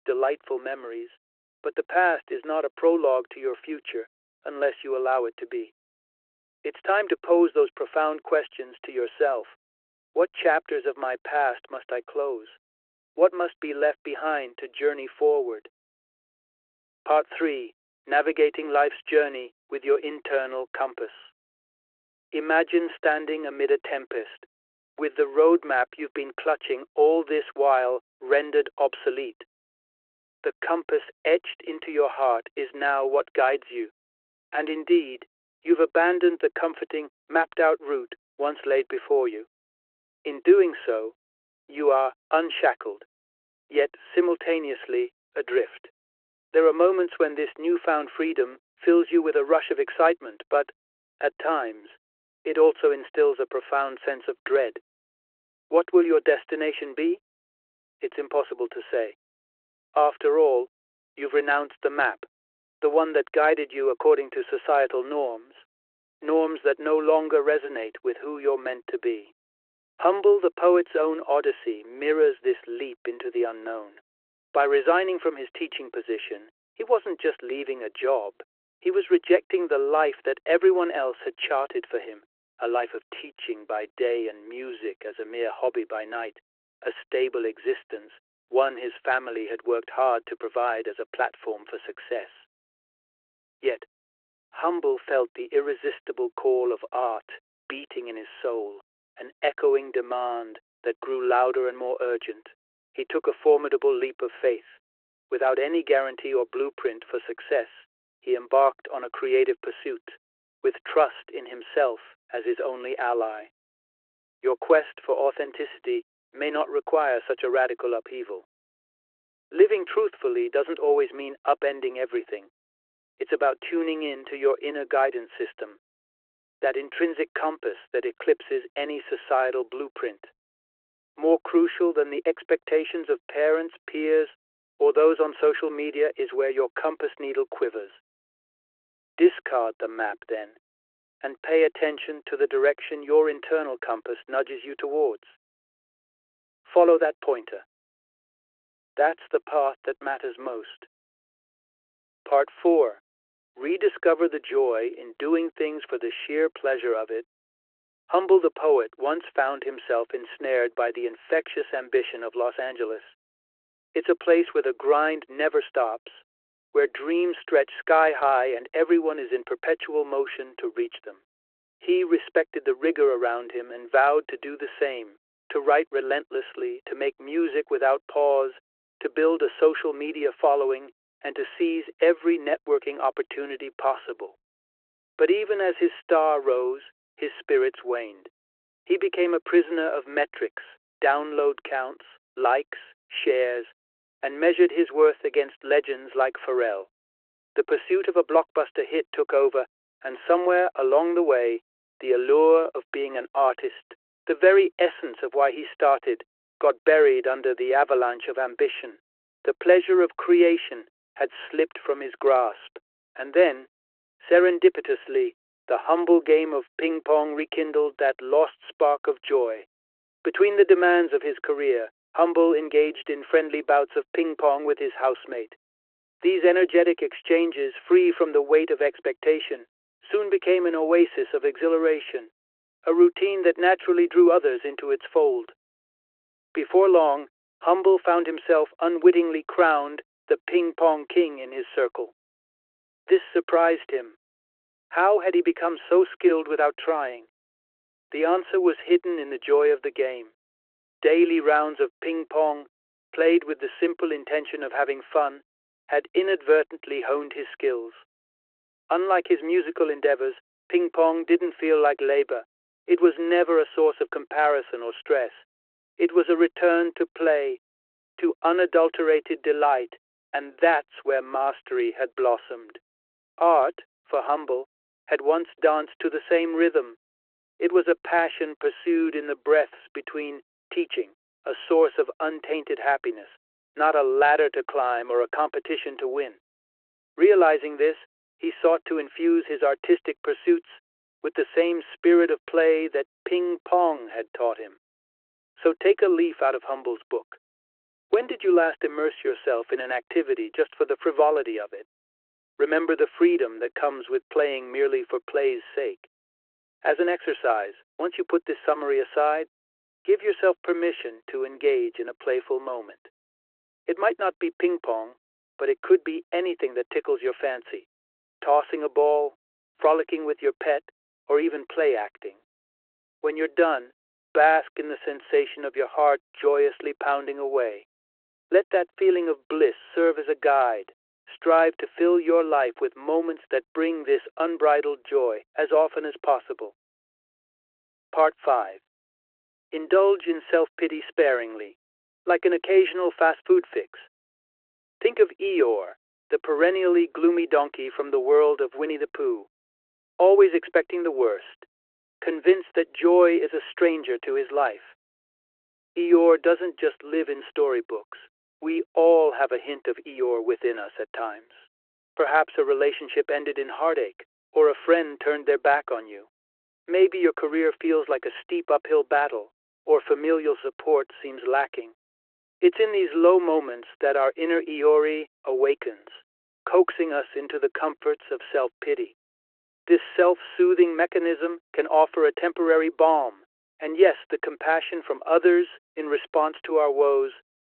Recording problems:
phone-call audio

